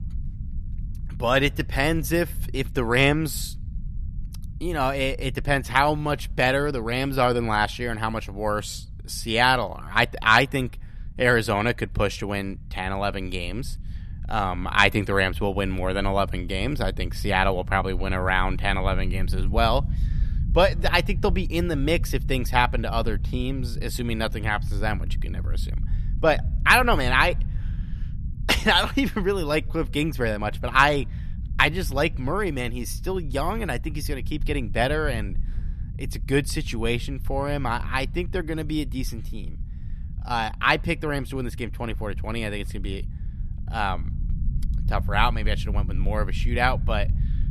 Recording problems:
low rumble; faint; throughout; 25 dB below the speech

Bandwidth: 13.5 kHz